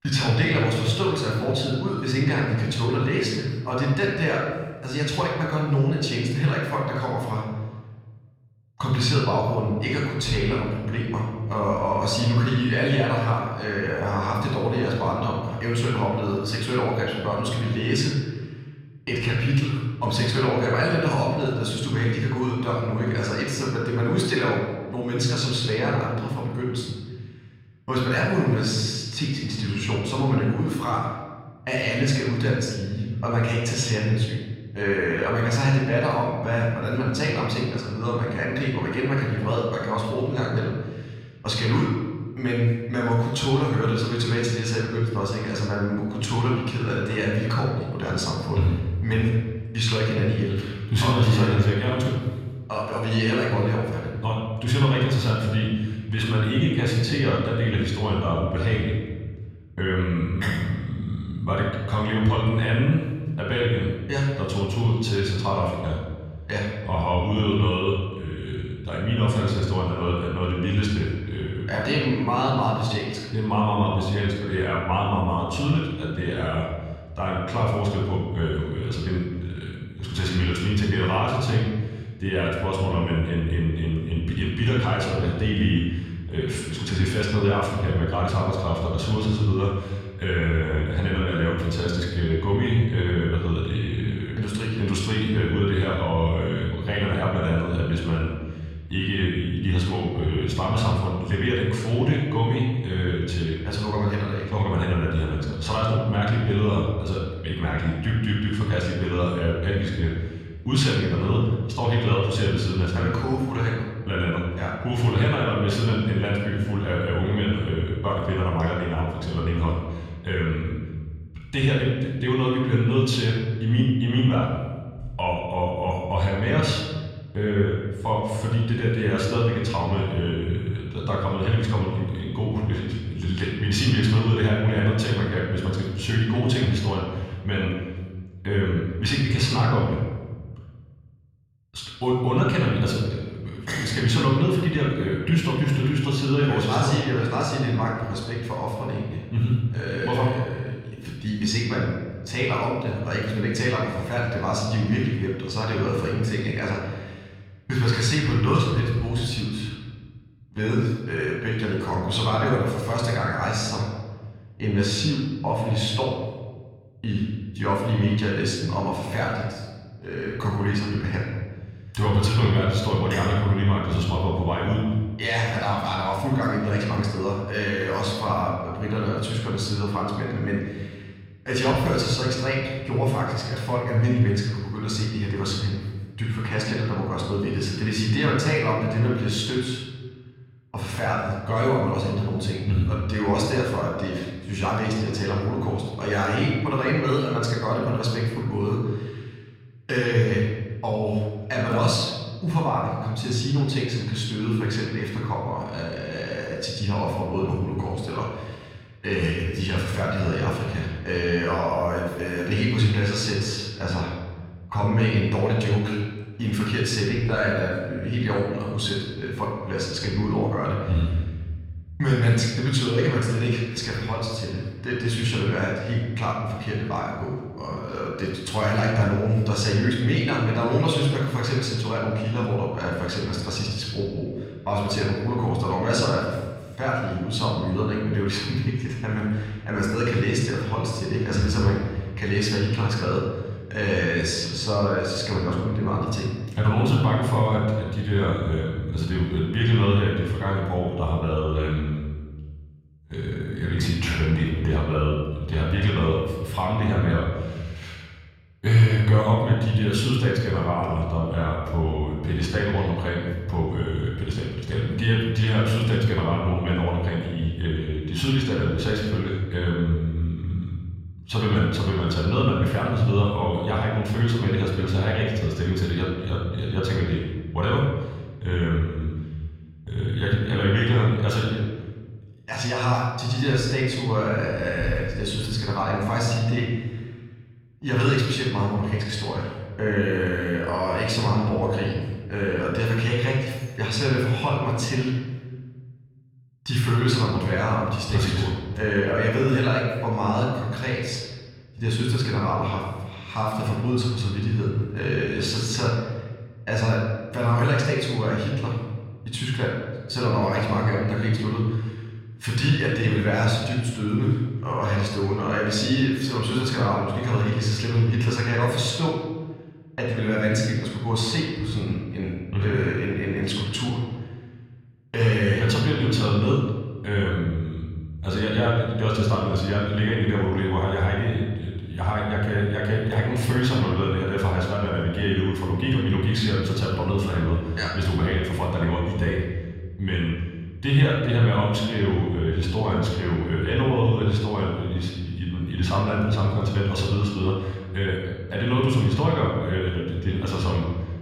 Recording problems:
off-mic speech; far
room echo; noticeable; dies away in 1.3 s

